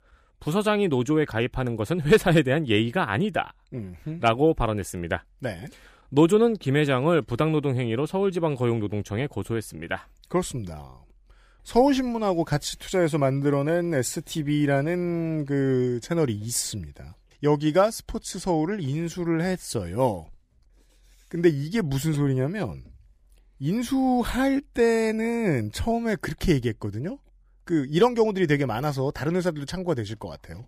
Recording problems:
none

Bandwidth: 15 kHz